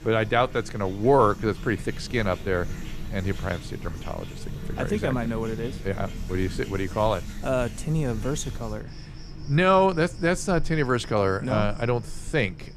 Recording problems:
animal sounds; noticeable; throughout; 15 dB below the speech

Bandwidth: 14.5 kHz